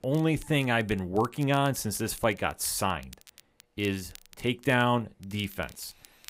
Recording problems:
crackle, like an old record; faint; 25 dB below the speech

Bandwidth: 15.5 kHz